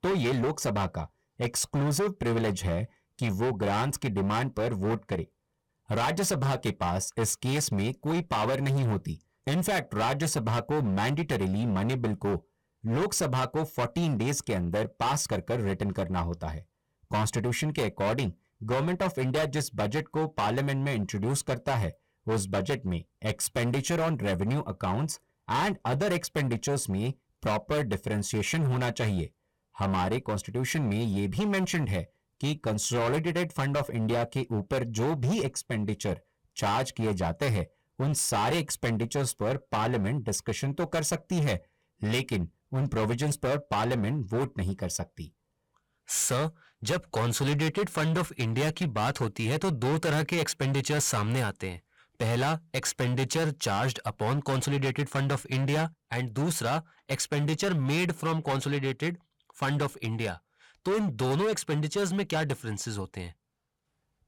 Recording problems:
distortion; heavy; 19% of the sound clipped

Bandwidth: 17.5 kHz